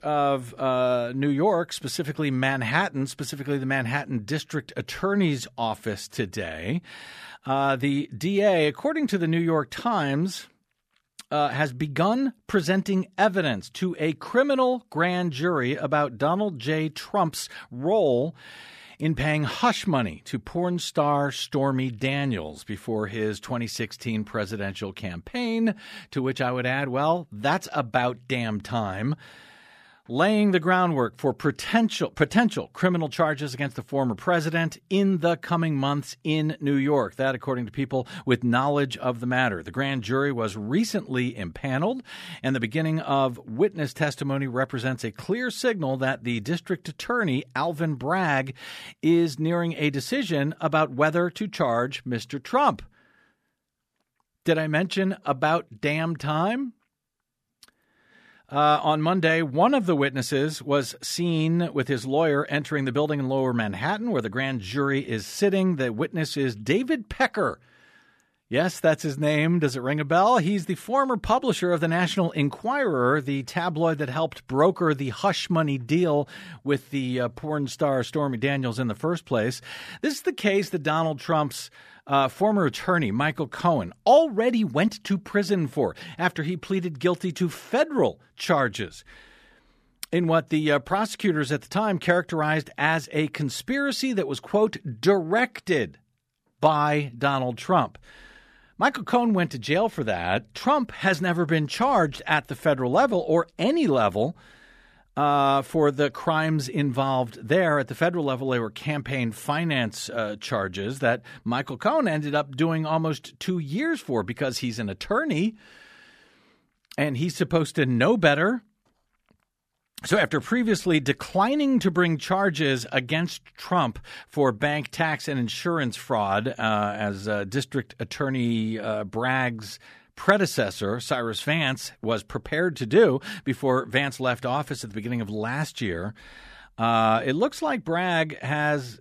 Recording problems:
none

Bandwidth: 14.5 kHz